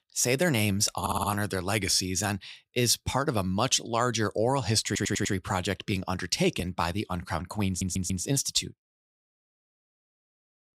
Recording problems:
audio stuttering; at 1 s, at 5 s and at 7.5 s

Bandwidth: 15.5 kHz